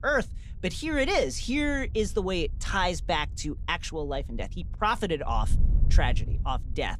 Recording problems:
wind noise on the microphone; occasional gusts; 25 dB below the speech

